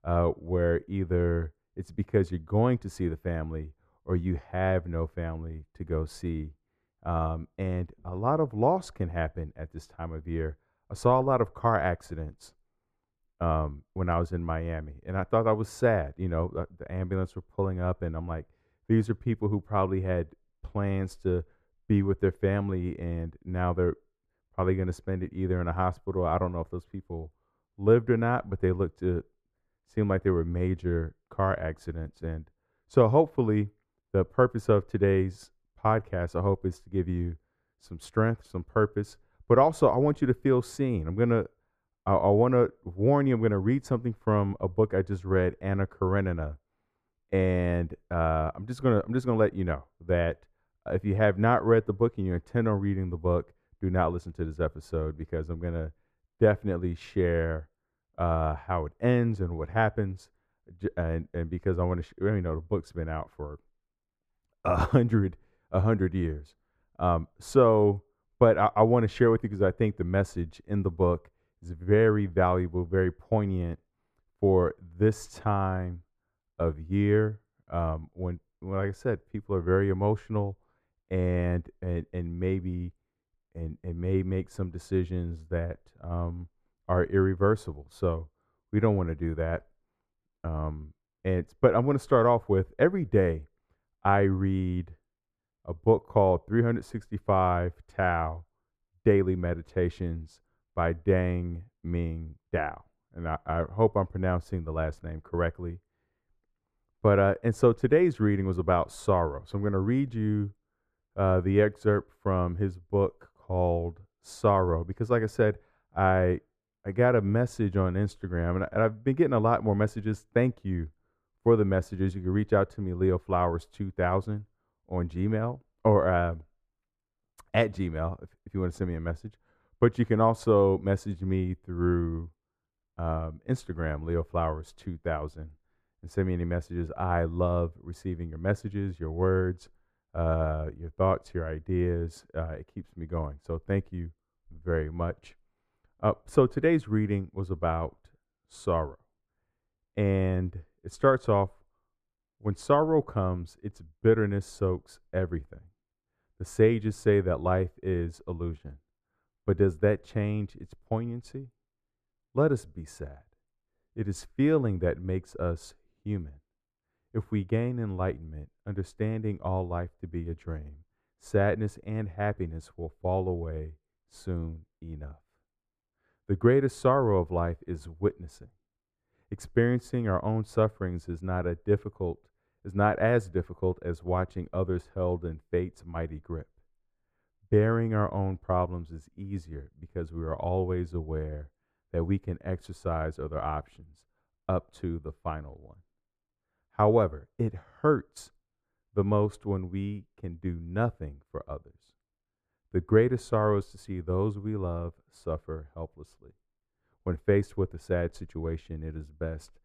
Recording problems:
muffled; slightly; fading above 2.5 kHz

